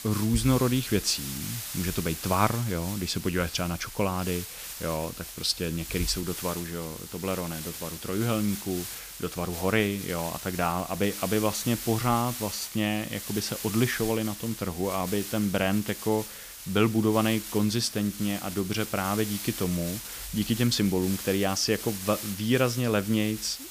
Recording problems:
hiss; loud; throughout; 8 dB below the speech

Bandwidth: 15 kHz